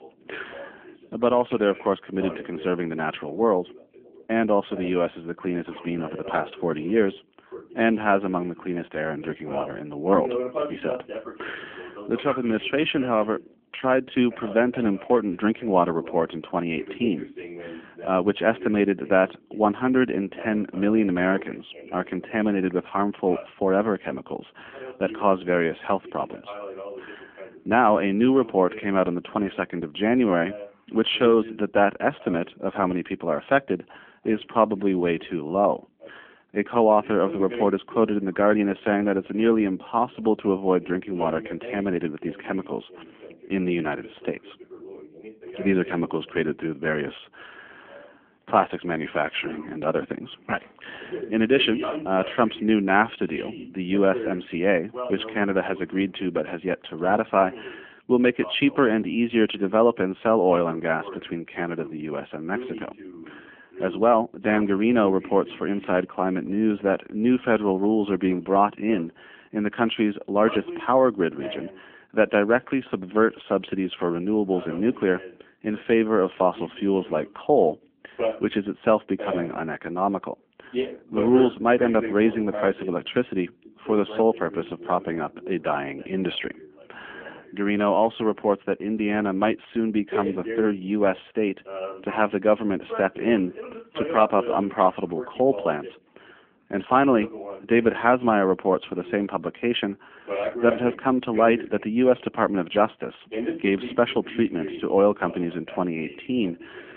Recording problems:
phone-call audio; nothing above 3.5 kHz
voice in the background; noticeable; throughout; 15 dB below the speech

